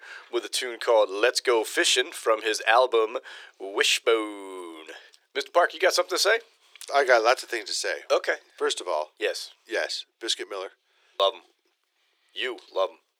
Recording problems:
thin; very; fading below 350 Hz

